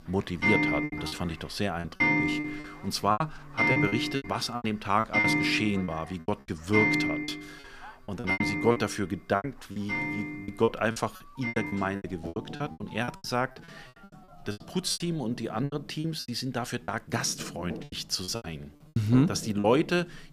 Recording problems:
household noises; very loud; throughout; 1 dB above the speech
electrical hum; faint; throughout; 50 Hz, 20 dB below the speech
alarms or sirens; faint; until 16 s; 25 dB below the speech
choppy; very; 14% of the speech affected

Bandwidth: 15 kHz